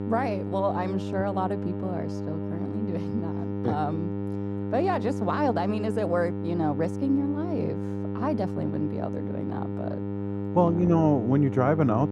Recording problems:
muffled; very; fading above 2 kHz
electrical hum; loud; throughout; 50 Hz, 8 dB below the speech
alarms or sirens; faint; throughout; 20 dB below the speech

